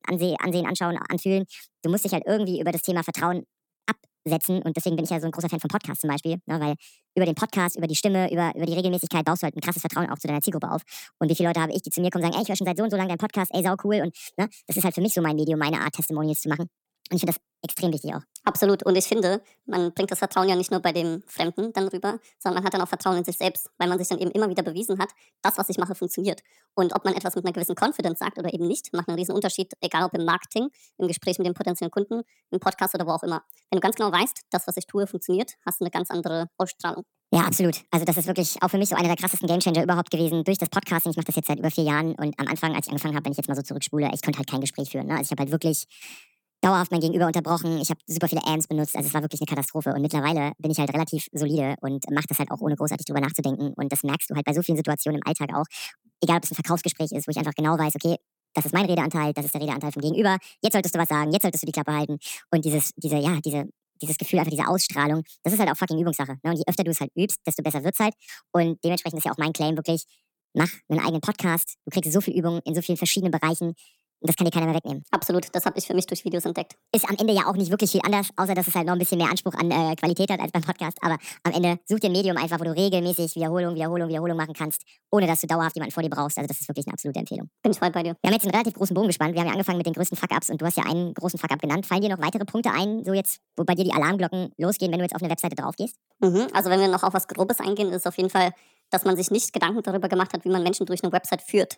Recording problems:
wrong speed and pitch; too fast and too high; 1.5 times normal speed

